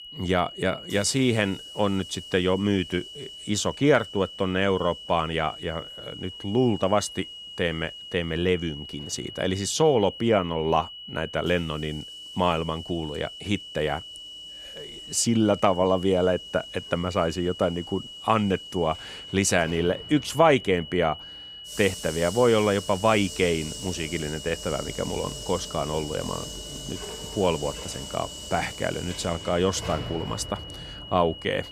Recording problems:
high-pitched whine; noticeable; throughout; 3 kHz, 15 dB below the speech
household noises; noticeable; throughout; 15 dB below the speech

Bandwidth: 15 kHz